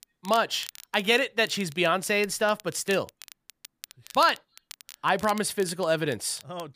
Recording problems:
crackle, like an old record; noticeable; 20 dB below the speech

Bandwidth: 15 kHz